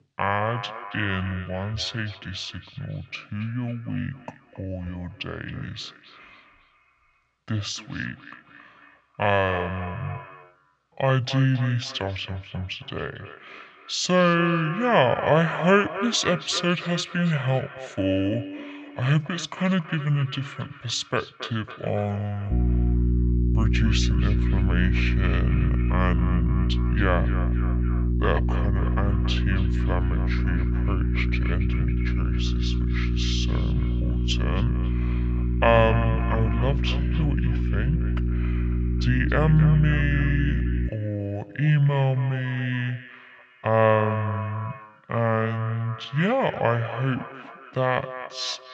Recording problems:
wrong speed and pitch; too slow and too low; 0.6 times normal speed
echo of what is said; noticeable; throughout; 270 ms later, 15 dB below the speech
electrical hum; loud; from 23 to 41 s; 60 Hz, 9 dB below the speech

